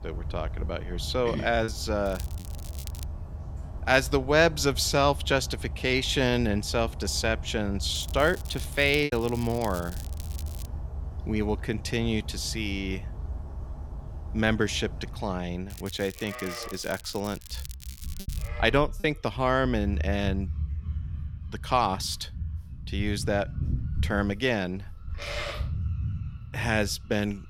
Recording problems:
animal sounds; loud; throughout; 9 dB below the speech
crackling; noticeable; at 2 s, from 8 to 11 s and from 16 to 18 s; 20 dB below the speech
choppy; occasionally; at 1.5 s, at 9 s and at 19 s; 2% of the speech affected

